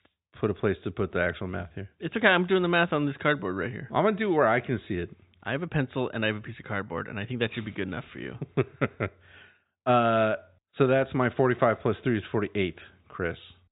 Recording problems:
high frequencies cut off; severe; nothing above 4 kHz

